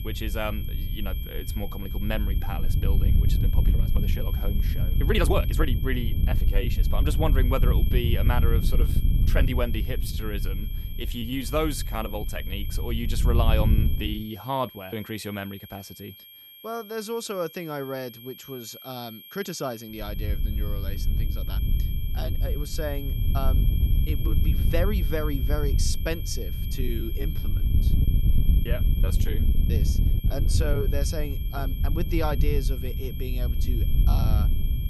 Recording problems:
wind noise on the microphone; heavy; until 14 s and from 20 s on; 9 dB below the speech
high-pitched whine; loud; throughout; 3 kHz, 10 dB below the speech
uneven, jittery; strongly; from 1 to 34 s

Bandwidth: 15.5 kHz